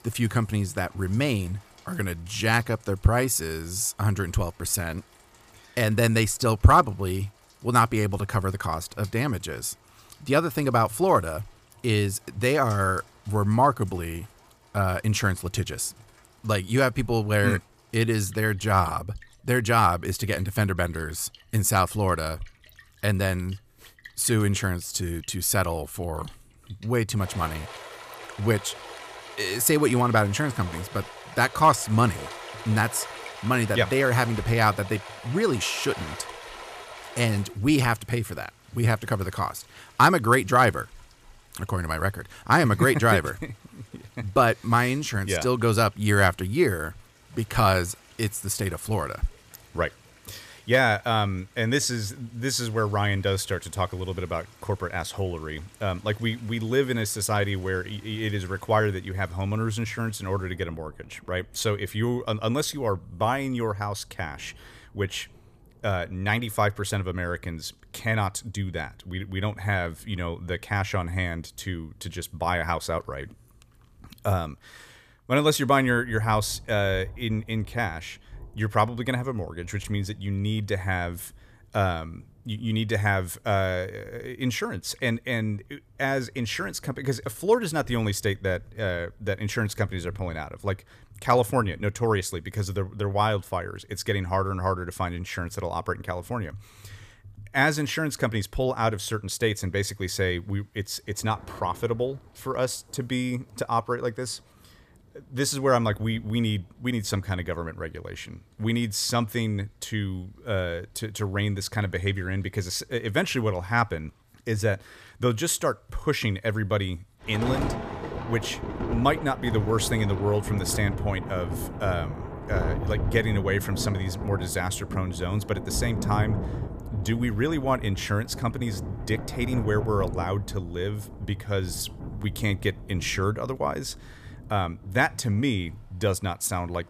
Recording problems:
rain or running water; noticeable; throughout; 10 dB below the speech

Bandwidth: 14.5 kHz